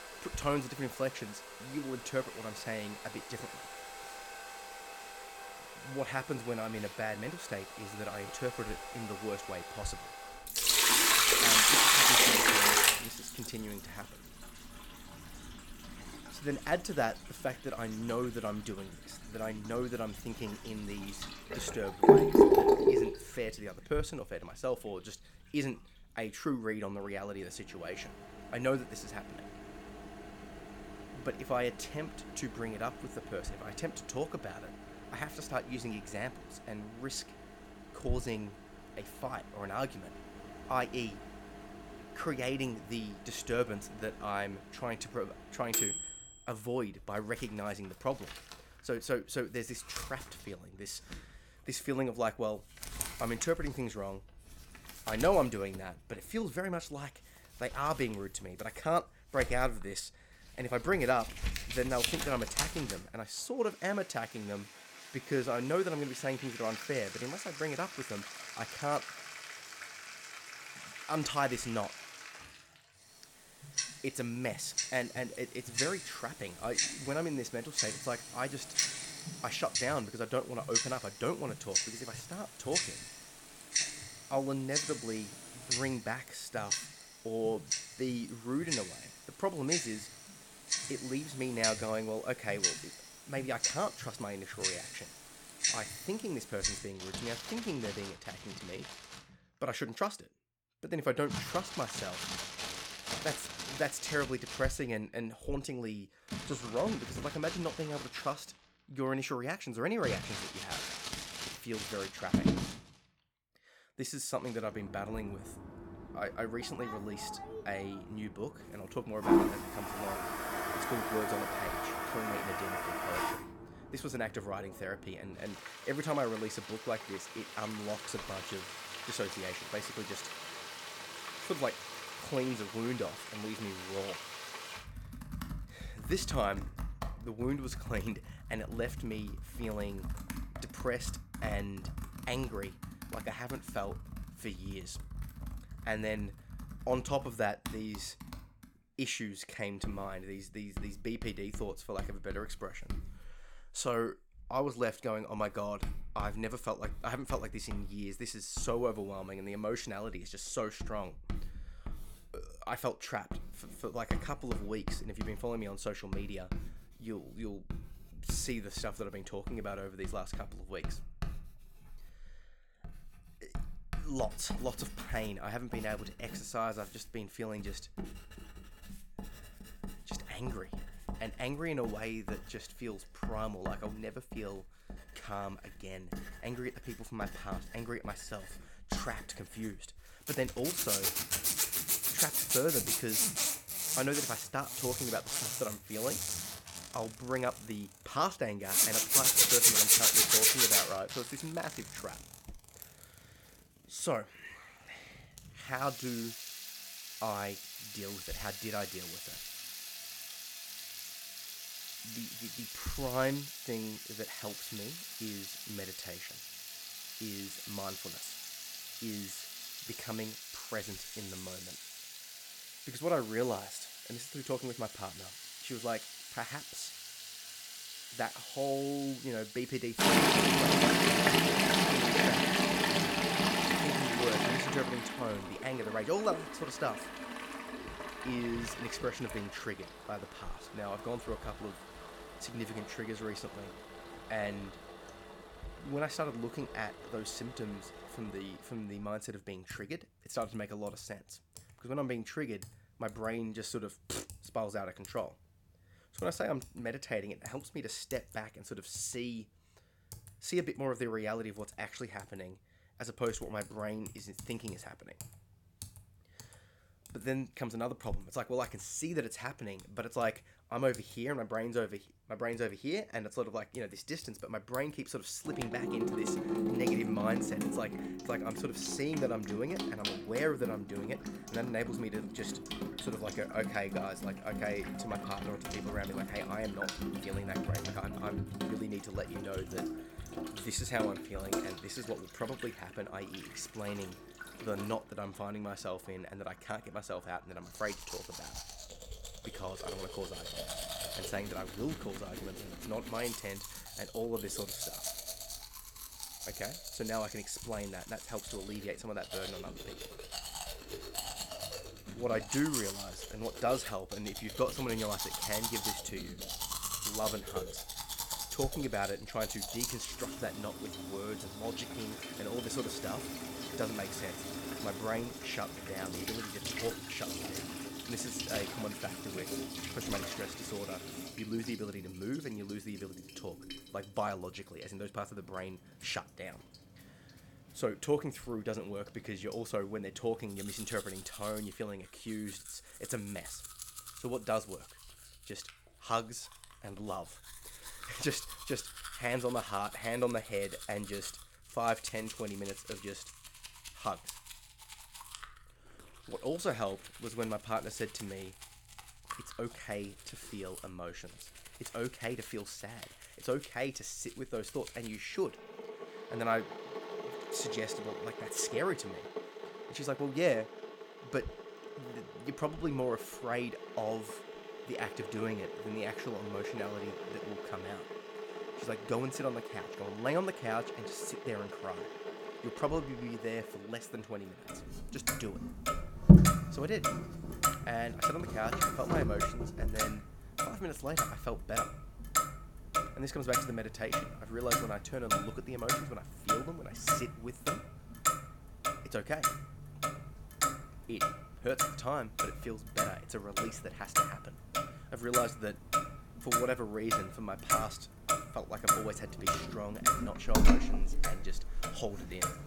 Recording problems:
household noises; very loud; throughout; 4 dB above the speech

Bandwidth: 17 kHz